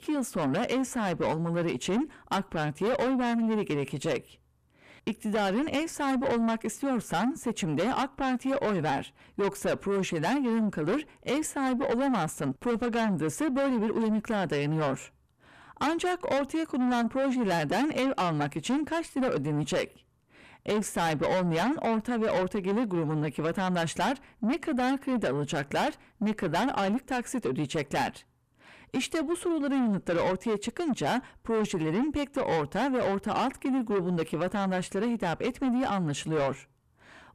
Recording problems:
distortion; heavy; 6 dB below the speech

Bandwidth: 14.5 kHz